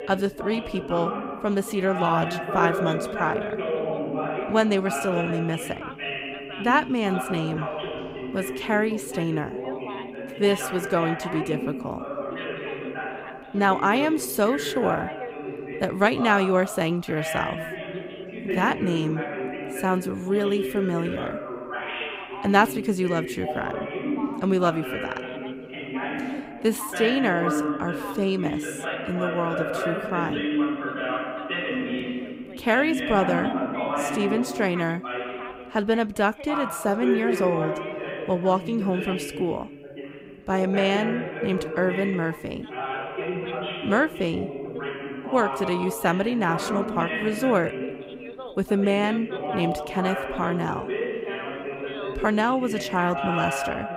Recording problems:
background chatter; loud; throughout; 2 voices, 5 dB below the speech

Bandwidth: 15.5 kHz